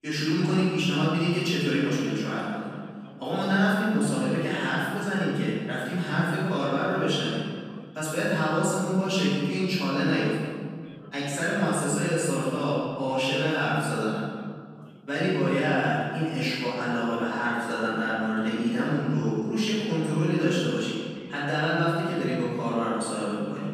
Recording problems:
room echo; strong; dies away in 1.7 s
off-mic speech; far
voice in the background; faint; throughout; 25 dB below the speech

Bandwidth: 14.5 kHz